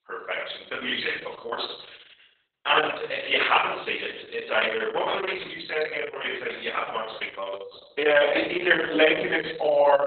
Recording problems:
off-mic speech; far
garbled, watery; badly; nothing above 4 kHz
room echo; noticeable; dies away in 0.7 s
thin; somewhat; fading below 600 Hz

